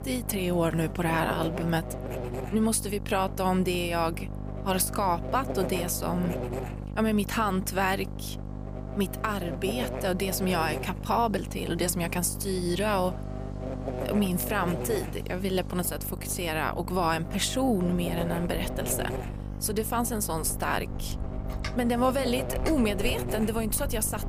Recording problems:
electrical hum; loud; throughout; 50 Hz, 10 dB below the speech
wind in the background; noticeable; throughout; 15 dB below the speech

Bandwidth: 15 kHz